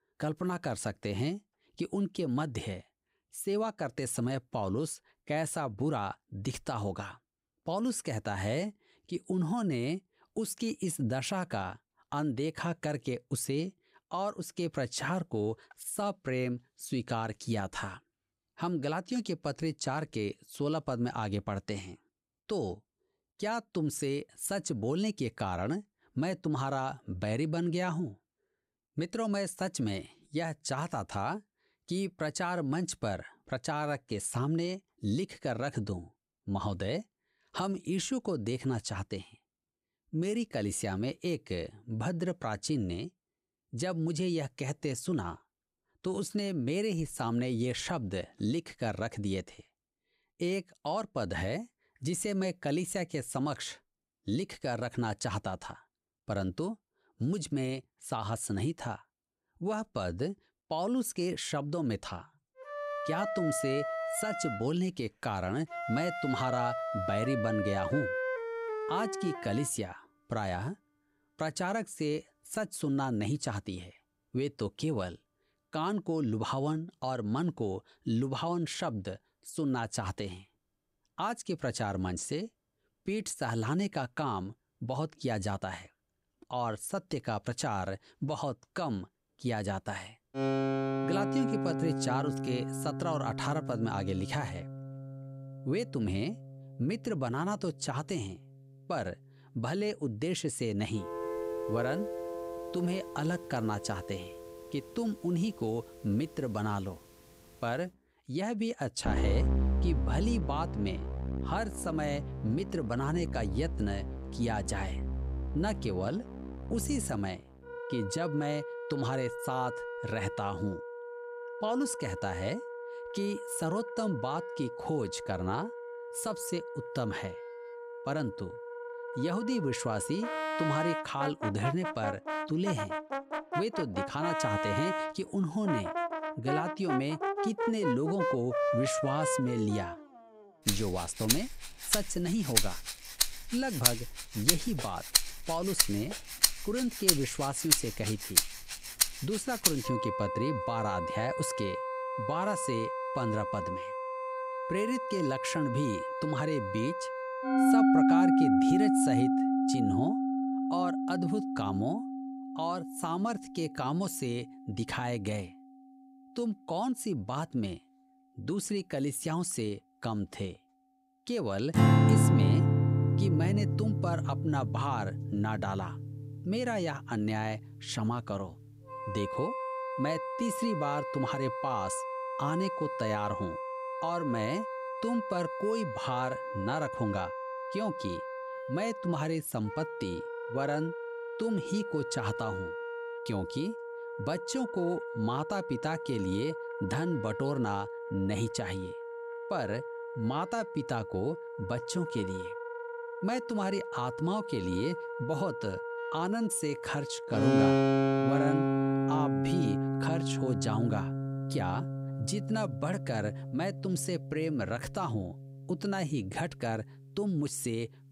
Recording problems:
background music; very loud; from 1:03 on; 1 dB above the speech

